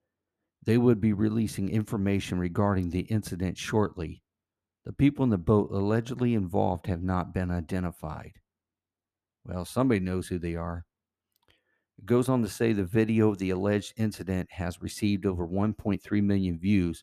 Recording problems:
none

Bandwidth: 14.5 kHz